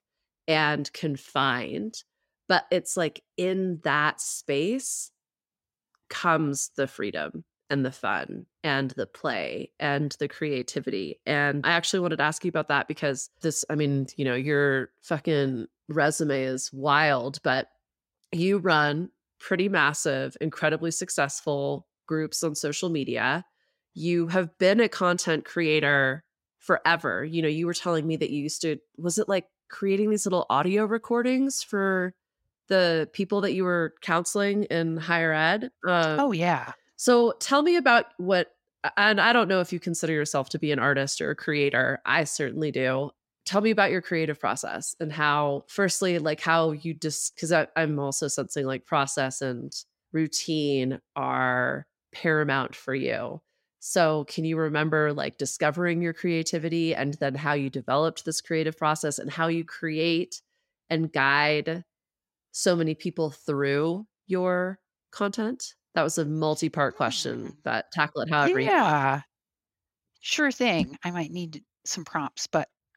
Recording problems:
none

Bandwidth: 16 kHz